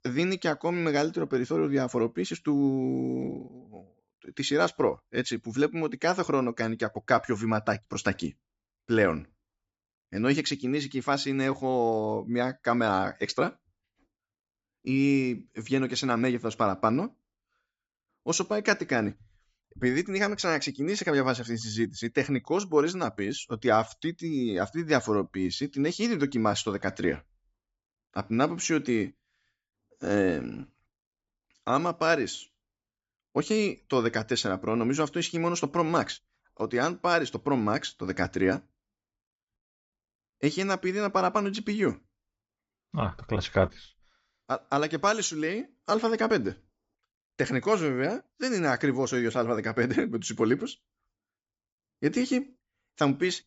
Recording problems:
high frequencies cut off; noticeable; nothing above 8 kHz

